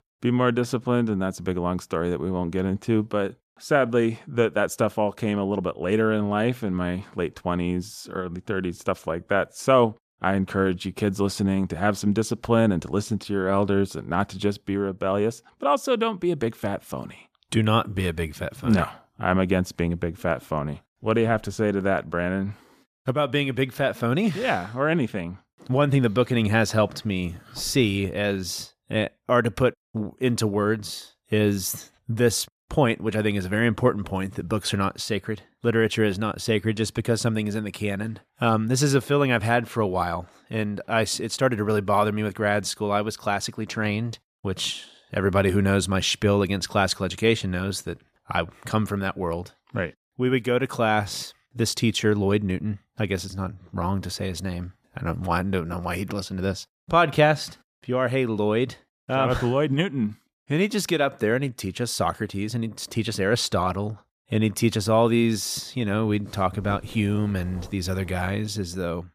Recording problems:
none

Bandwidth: 14.5 kHz